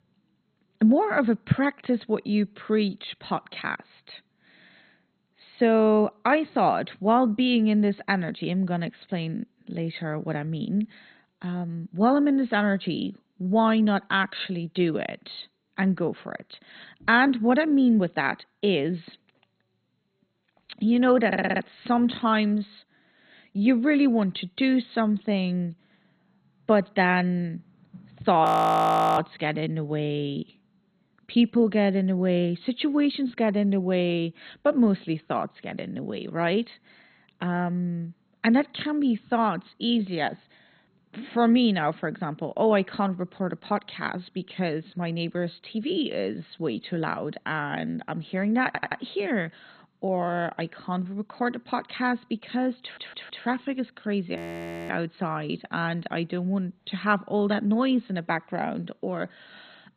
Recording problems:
garbled, watery; badly; nothing above 14.5 kHz
audio stuttering; at 21 s, at 49 s and at 53 s
audio freezing; at 28 s for 0.5 s and at 54 s for 0.5 s

